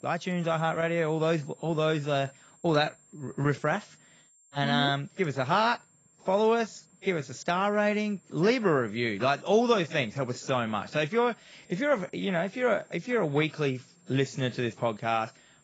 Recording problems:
garbled, watery; badly; nothing above 7.5 kHz
high-pitched whine; faint; throughout; 7.5 kHz, 30 dB below the speech

